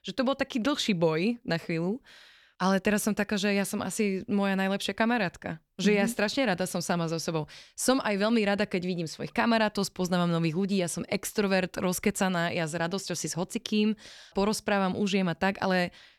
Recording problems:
none

